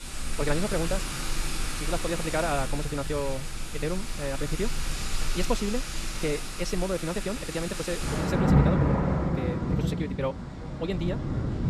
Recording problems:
wrong speed, natural pitch; too fast; 1.6 times normal speed
rain or running water; very loud; throughout; 2 dB above the speech
chatter from many people; faint; throughout; 30 dB below the speech

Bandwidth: 14.5 kHz